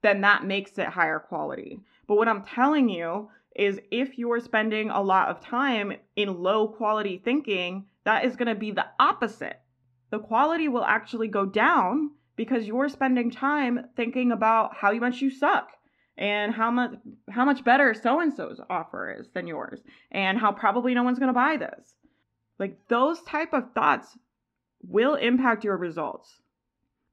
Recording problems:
muffled; slightly; fading above 2.5 kHz

